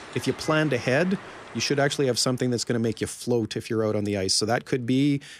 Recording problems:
train or aircraft noise; noticeable; throughout; 15 dB below the speech

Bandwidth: 15 kHz